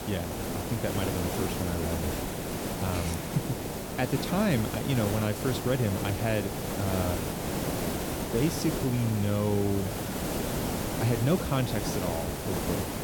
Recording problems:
hiss; loud; throughout; 2 dB below the speech

